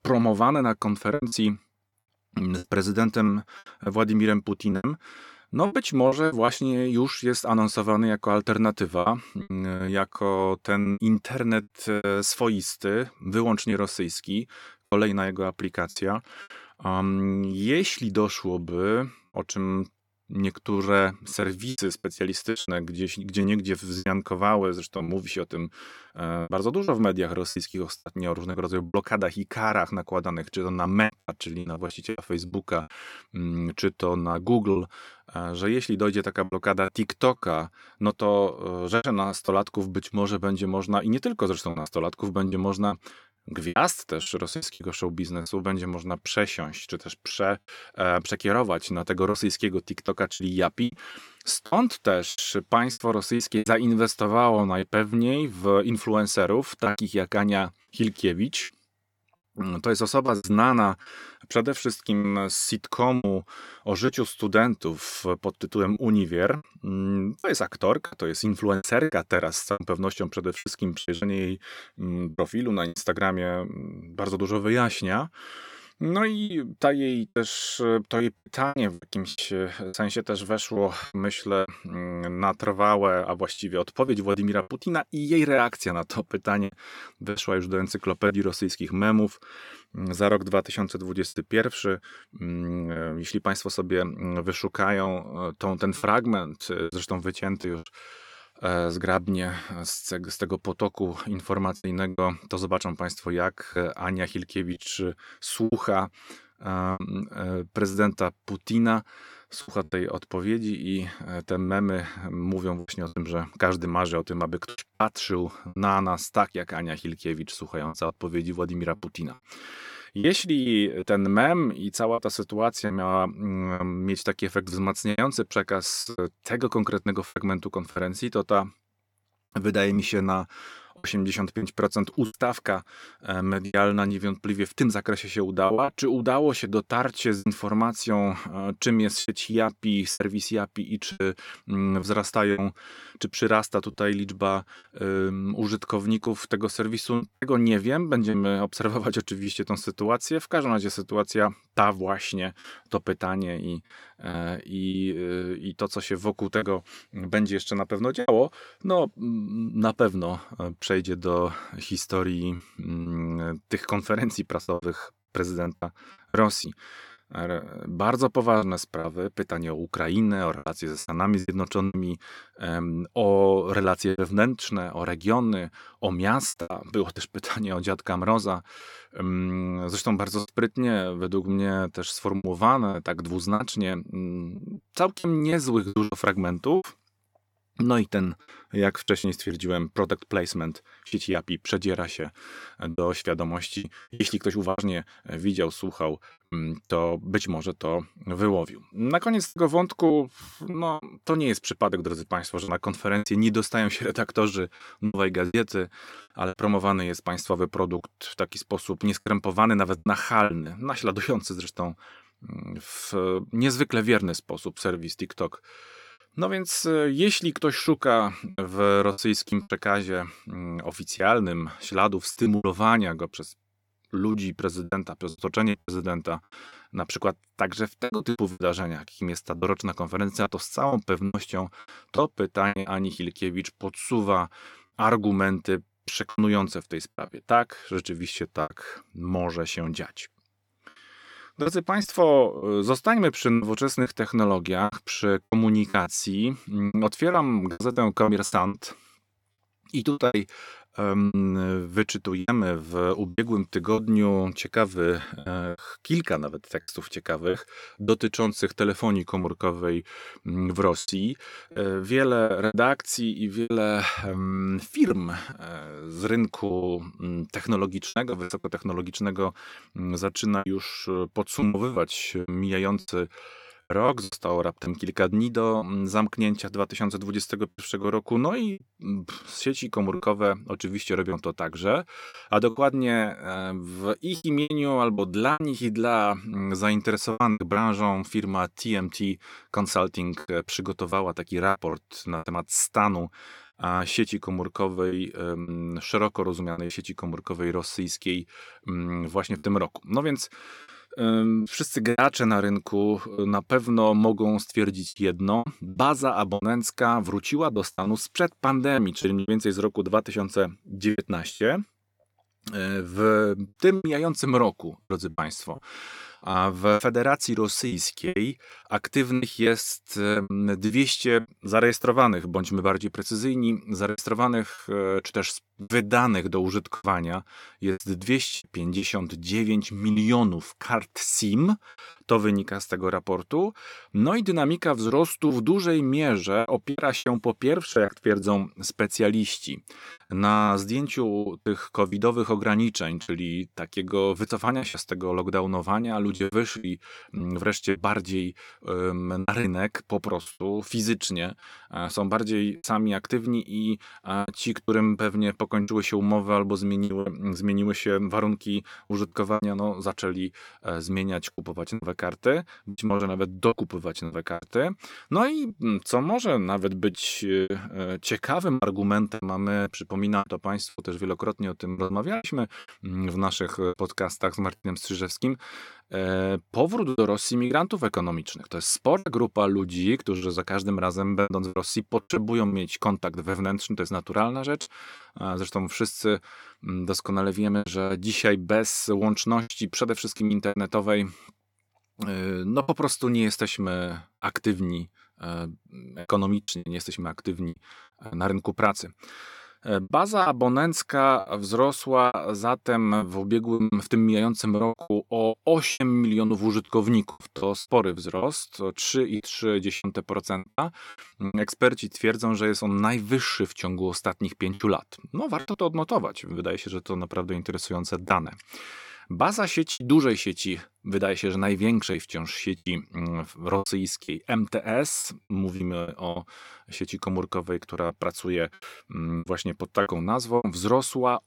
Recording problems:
choppy; very; 7% of the speech affected

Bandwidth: 17.5 kHz